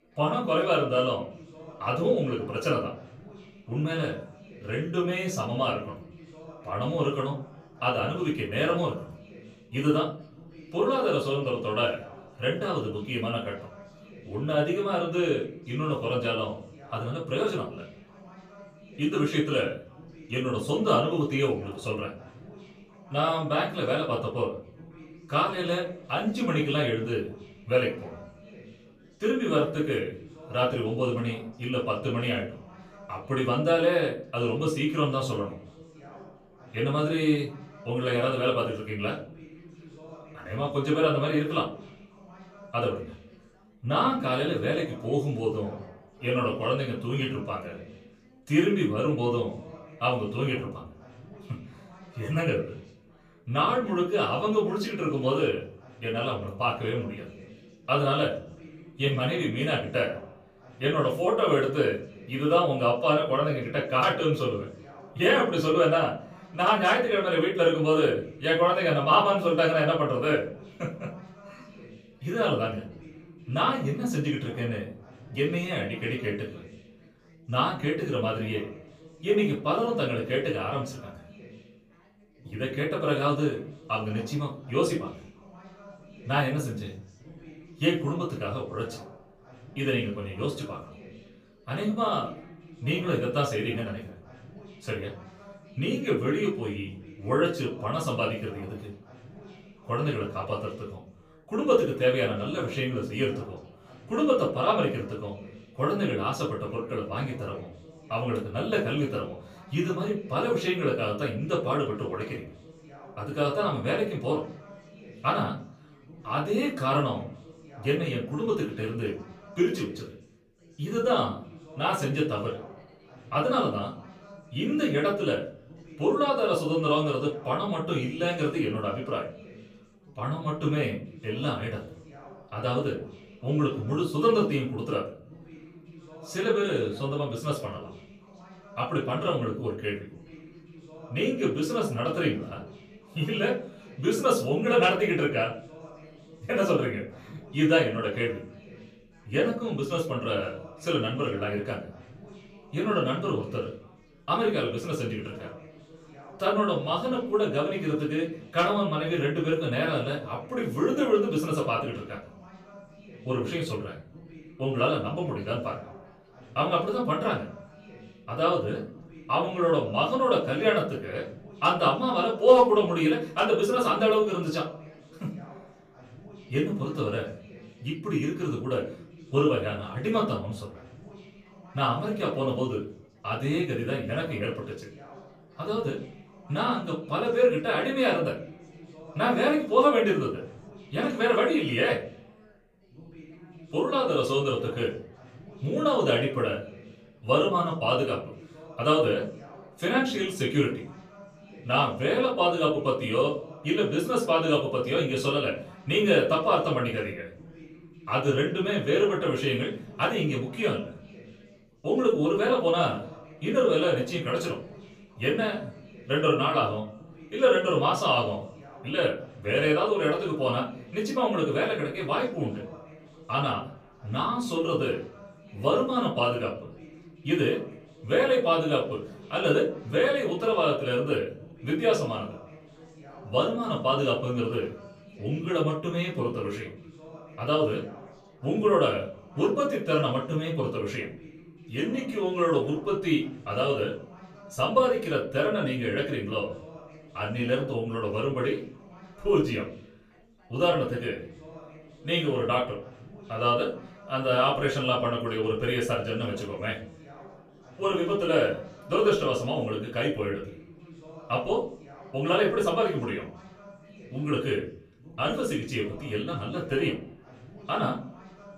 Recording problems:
off-mic speech; far
room echo; slight; dies away in 0.5 s
background chatter; faint; throughout; 4 voices, 20 dB below the speech

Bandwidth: 15 kHz